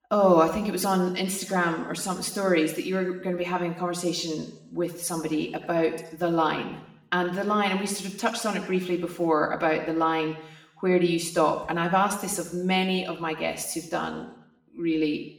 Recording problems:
room echo; slight; dies away in 0.8 s
off-mic speech; somewhat distant

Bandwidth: 18 kHz